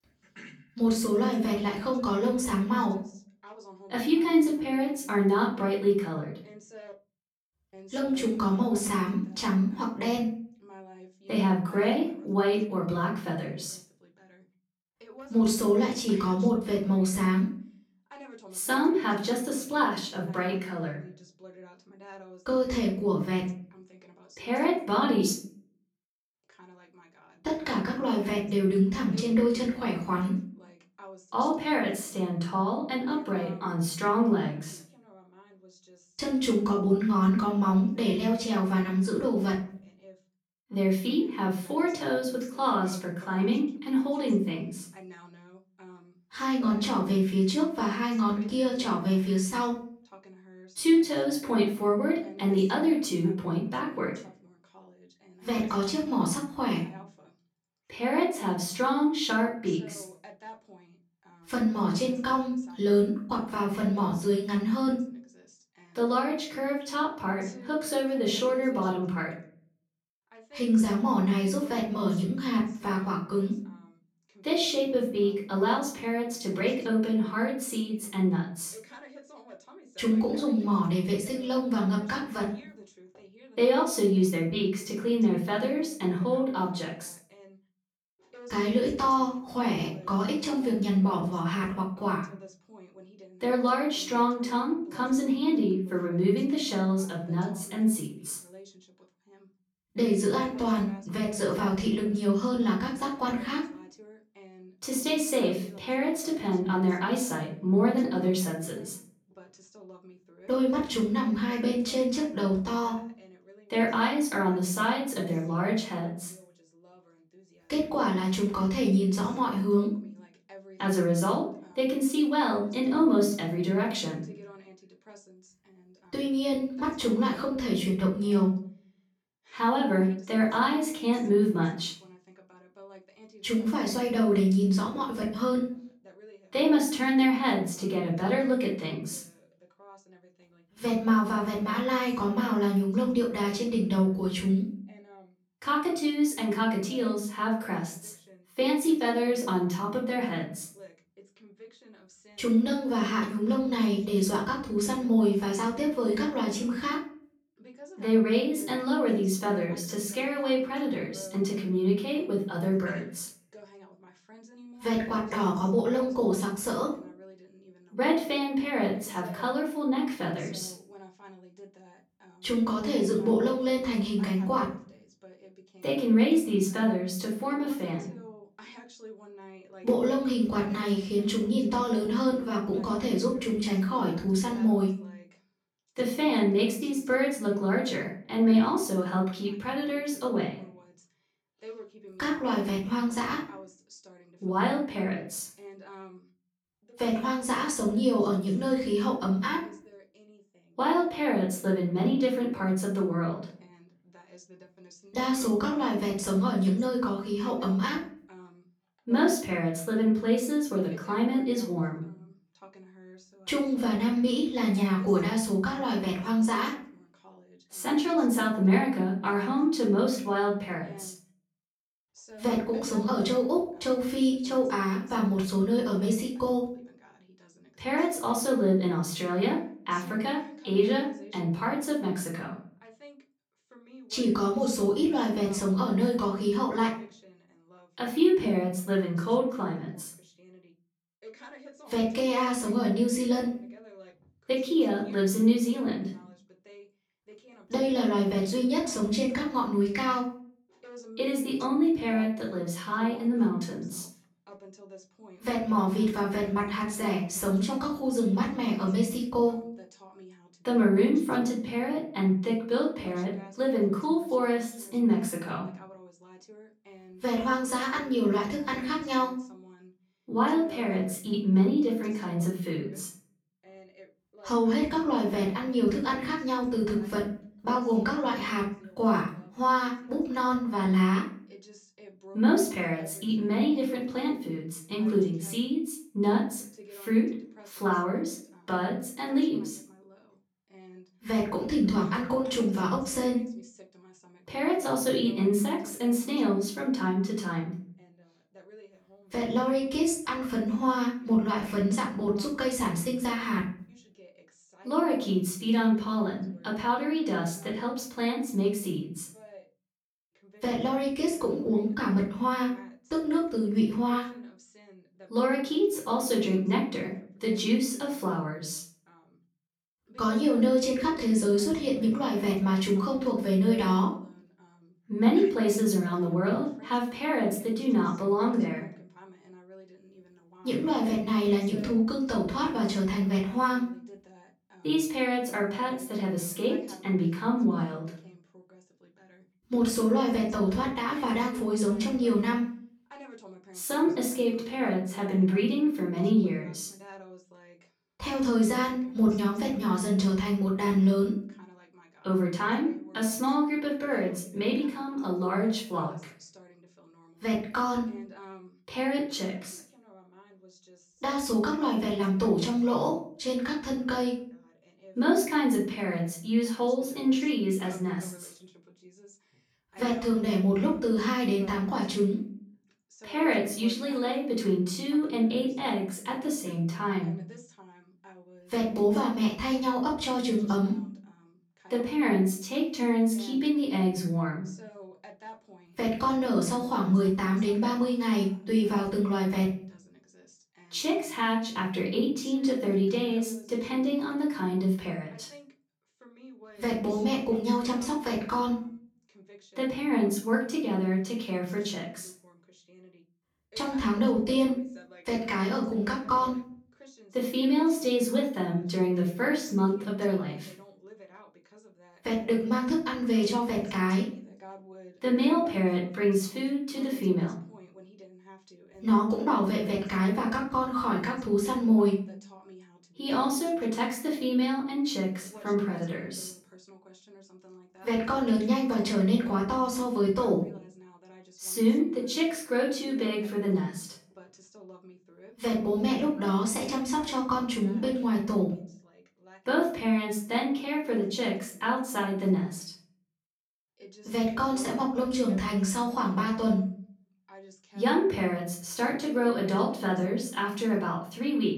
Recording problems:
off-mic speech; far
room echo; noticeable; dies away in 0.4 s
voice in the background; faint; throughout; 25 dB below the speech

